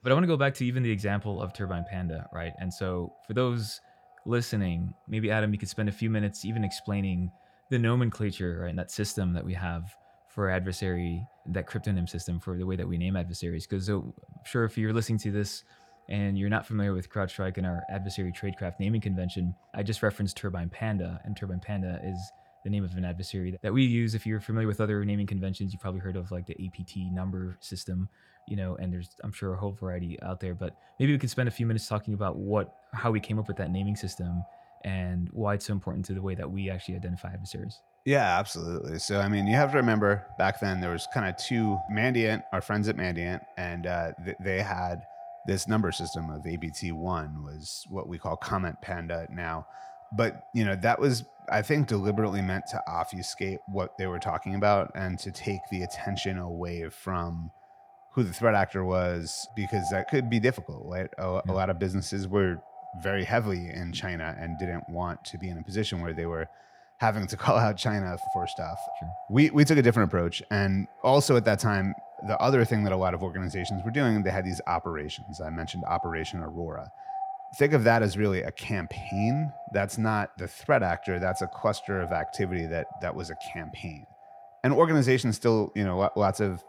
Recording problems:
echo of what is said; noticeable; throughout; 350 ms later, 15 dB below the speech

